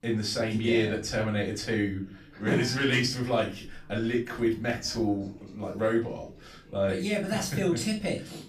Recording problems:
off-mic speech; far
room echo; slight; dies away in 0.3 s
chatter from many people; faint; throughout; 25 dB below the speech

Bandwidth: 14.5 kHz